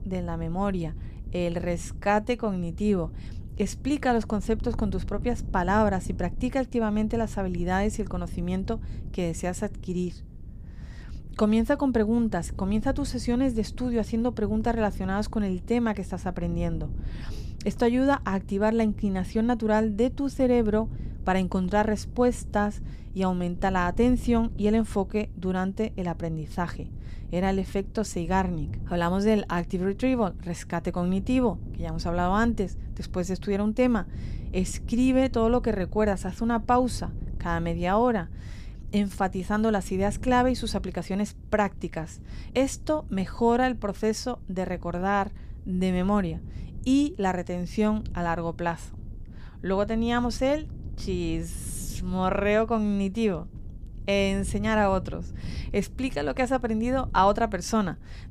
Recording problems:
wind noise on the microphone; occasional gusts; 25 dB below the speech

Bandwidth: 15 kHz